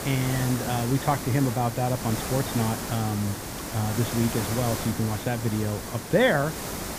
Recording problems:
high frequencies cut off; severe; nothing above 4 kHz
hiss; loud; throughout; 5 dB below the speech

